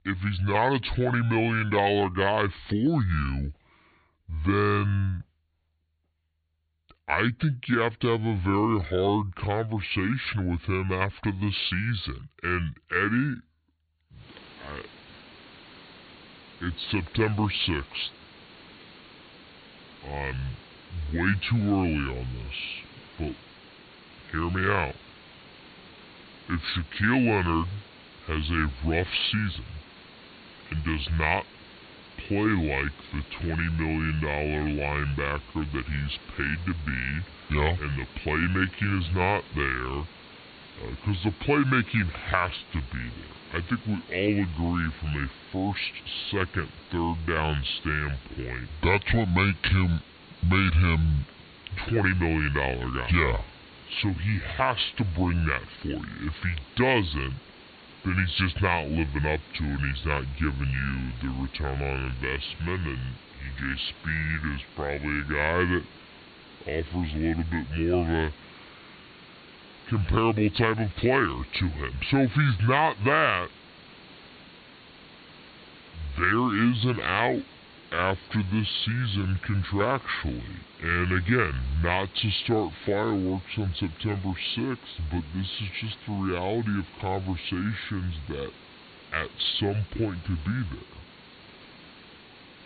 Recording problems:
high frequencies cut off; severe; nothing above 4.5 kHz
wrong speed and pitch; too slow and too low; 0.7 times normal speed
hiss; faint; from 14 s on; 20 dB below the speech

